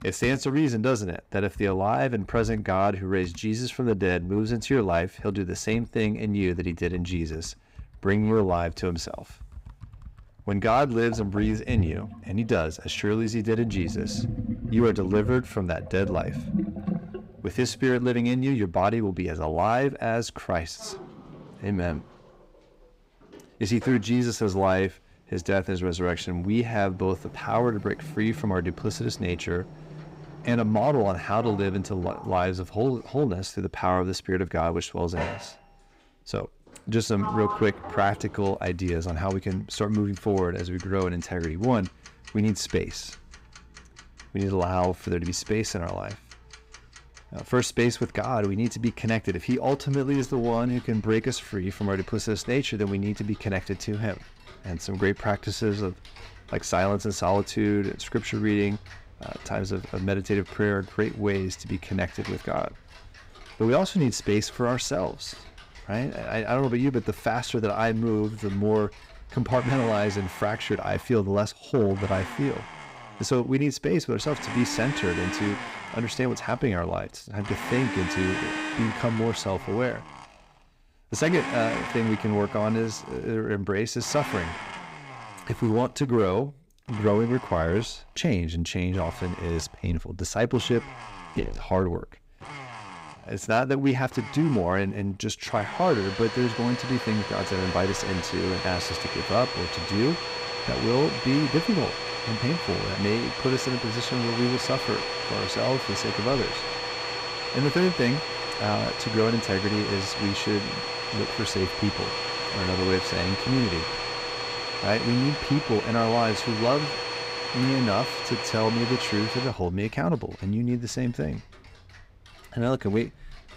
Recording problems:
household noises; loud; throughout; 5 dB below the speech

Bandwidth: 15.5 kHz